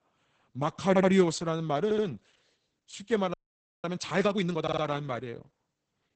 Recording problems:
garbled, watery; badly; nothing above 8 kHz
audio stuttering; at 1 s, at 2 s and at 4.5 s
audio freezing; at 3.5 s for 0.5 s

